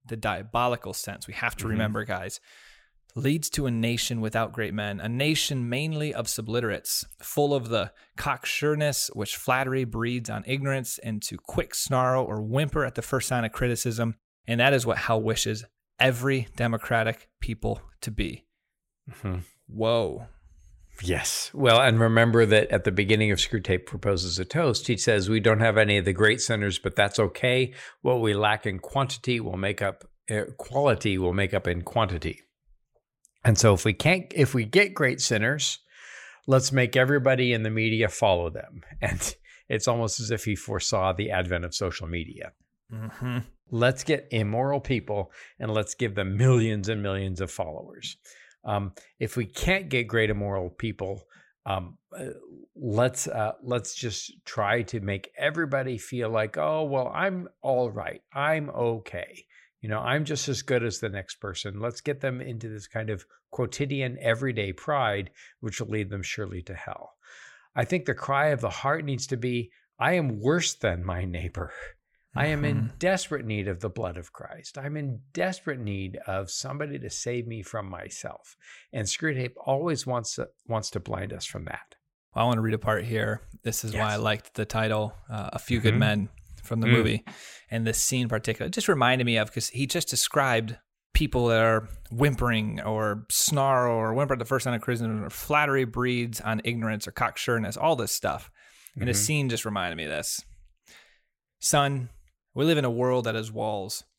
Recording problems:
none

